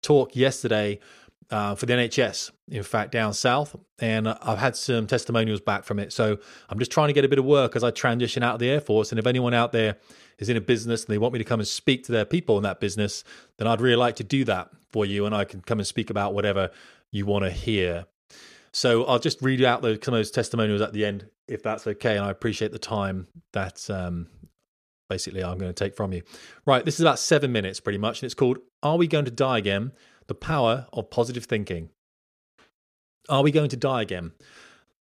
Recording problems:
none

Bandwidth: 14.5 kHz